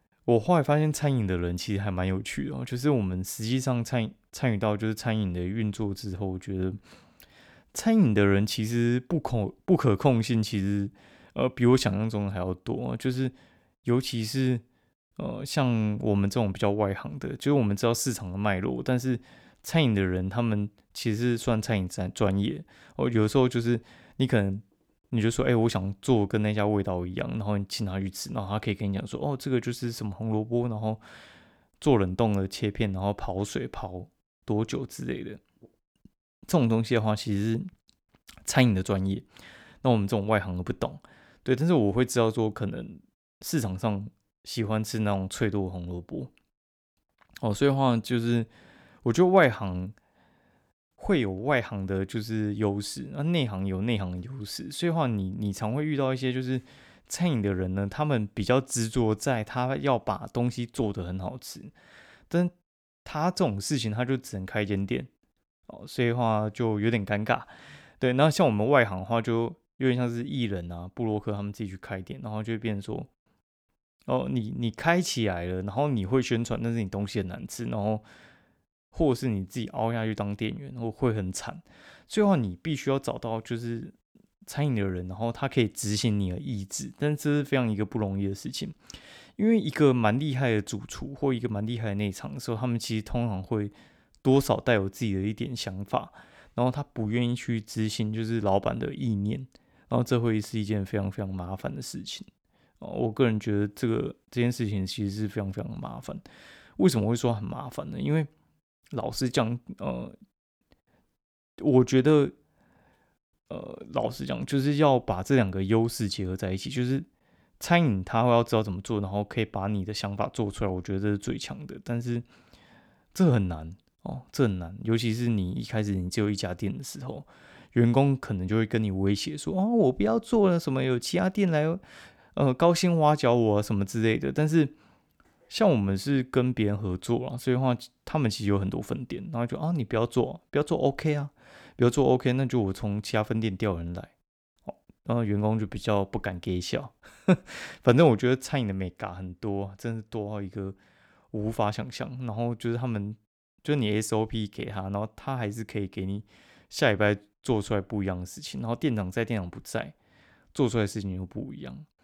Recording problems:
none

